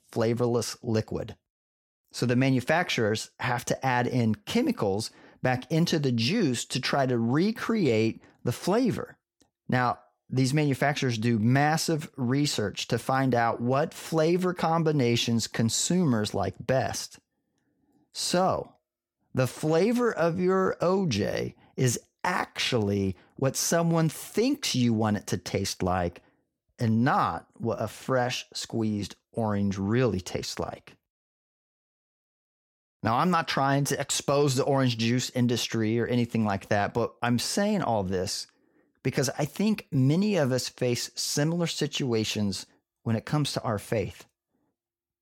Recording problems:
none

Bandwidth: 17 kHz